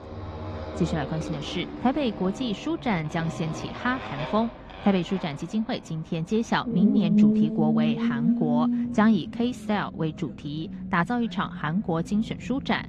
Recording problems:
muffled; slightly; fading above 3.5 kHz
garbled, watery; slightly; nothing above 12.5 kHz
traffic noise; loud; throughout; 2 dB below the speech

